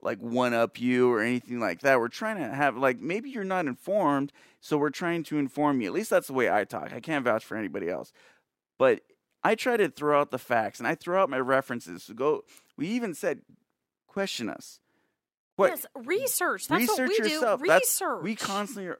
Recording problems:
none

